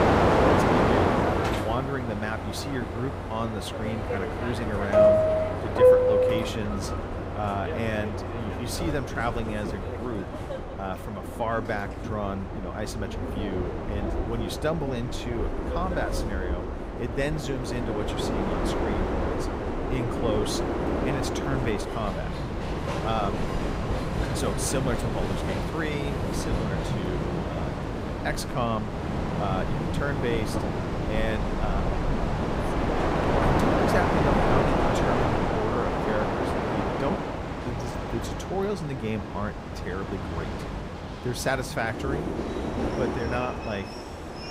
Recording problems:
train or aircraft noise; very loud; throughout; 4 dB above the speech

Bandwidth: 15.5 kHz